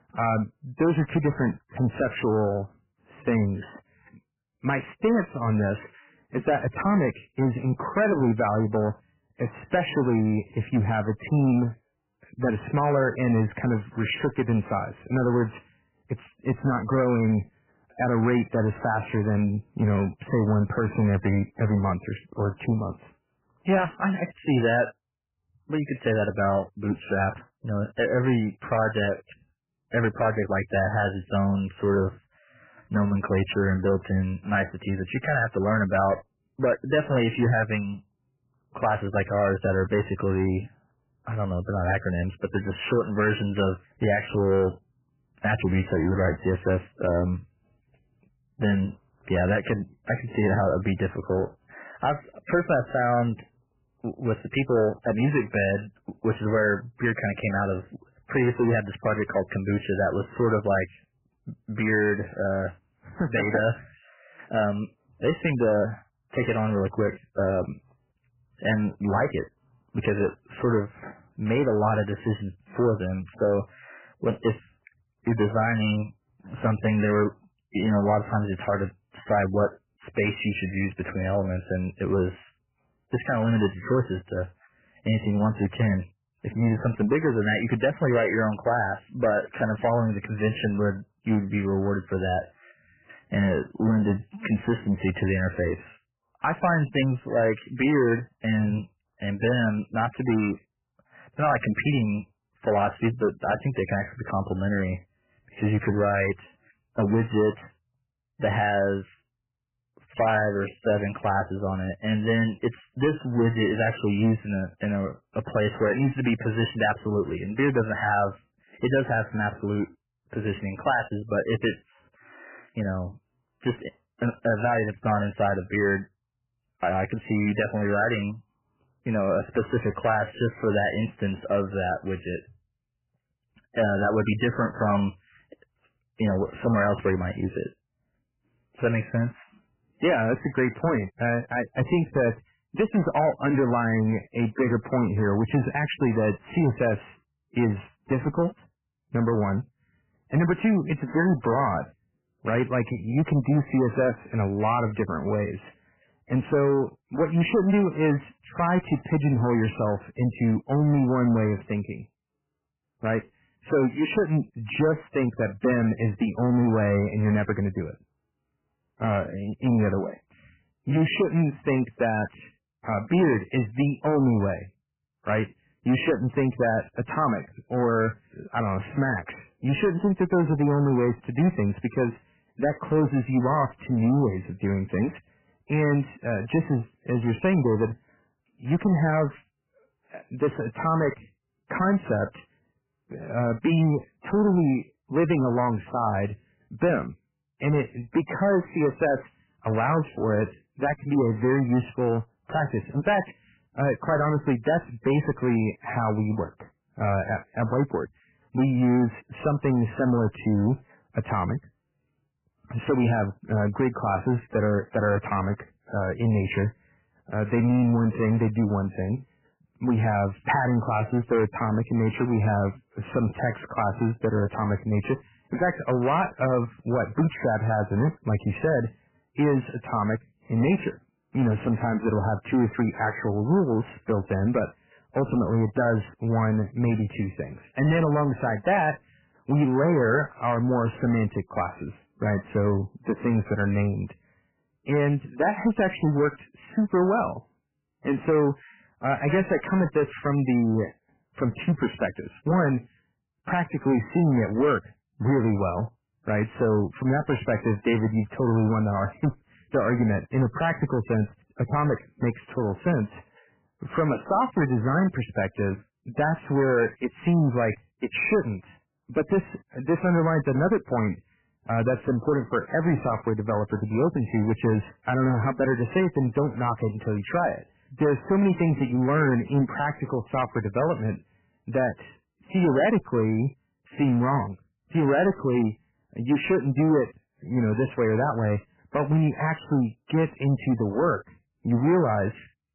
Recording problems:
garbled, watery; badly; nothing above 3 kHz
distortion; slight; 10 dB below the speech

